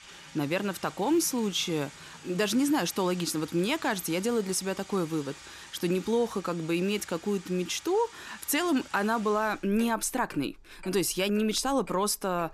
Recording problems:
household noises; noticeable; throughout; 20 dB below the speech

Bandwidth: 14 kHz